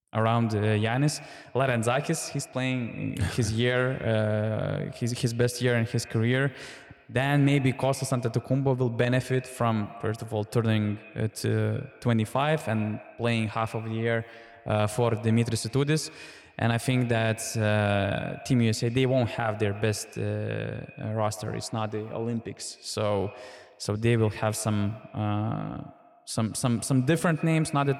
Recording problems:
echo of what is said; noticeable; throughout; 130 ms later, 20 dB below the speech

